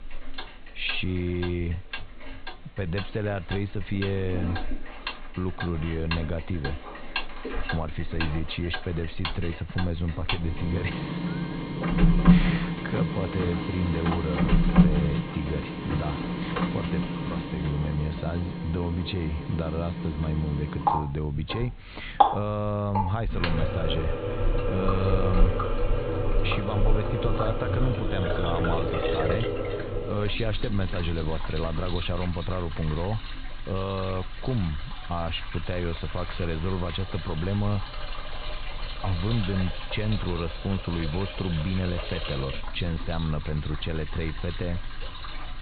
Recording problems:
high frequencies cut off; severe; nothing above 4 kHz
household noises; very loud; throughout; as loud as the speech
hiss; faint; throughout; 25 dB below the speech

